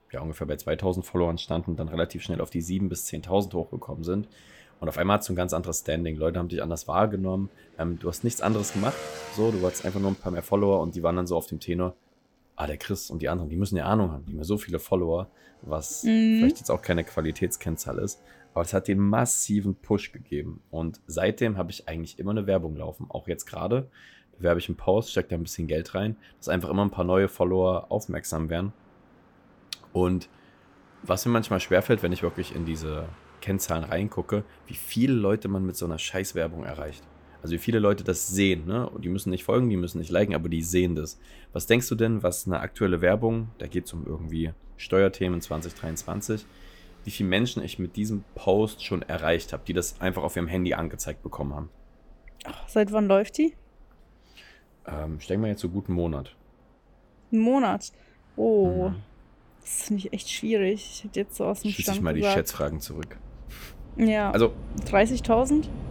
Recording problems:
traffic noise; faint; throughout; 25 dB below the speech
train or aircraft noise; faint; throughout; 25 dB below the speech

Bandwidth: 18 kHz